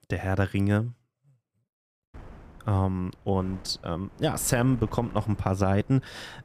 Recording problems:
wind noise on the microphone; occasional gusts; from 2 s on; 20 dB below the speech

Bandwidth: 14.5 kHz